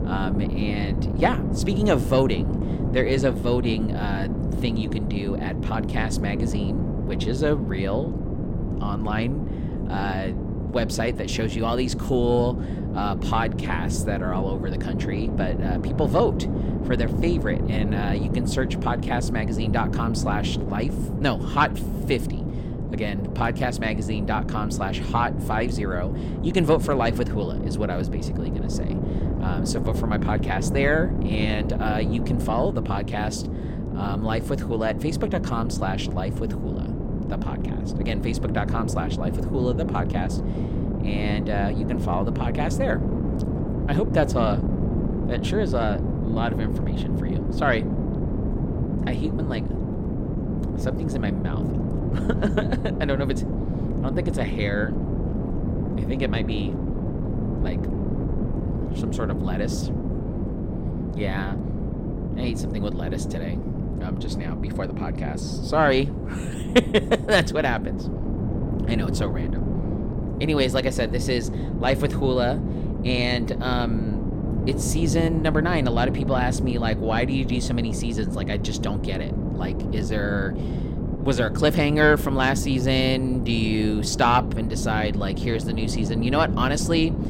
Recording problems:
wind noise on the microphone; heavy; 8 dB below the speech

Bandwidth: 16.5 kHz